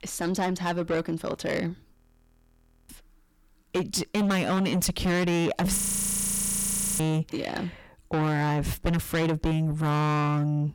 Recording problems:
distortion; heavy; 6 dB below the speech
audio freezing; at 2 s for 1 s and at 6 s for 1 s

